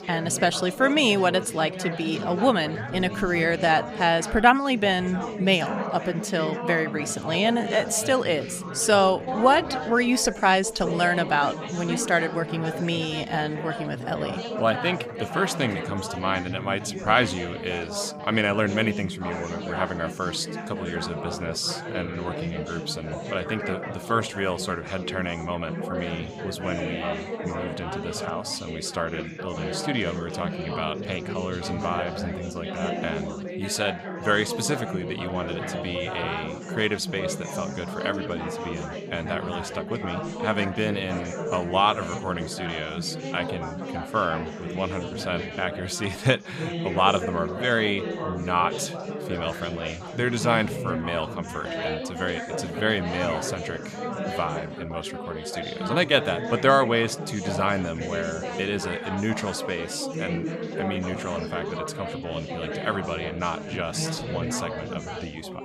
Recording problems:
chatter from many people; loud; throughout; 6 dB below the speech

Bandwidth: 15 kHz